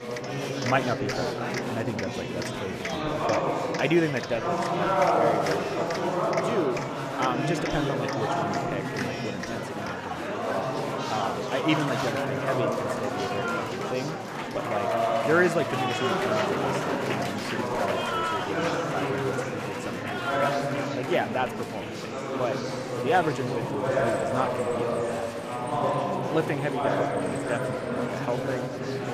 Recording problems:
murmuring crowd; very loud; throughout; 3 dB above the speech

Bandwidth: 14.5 kHz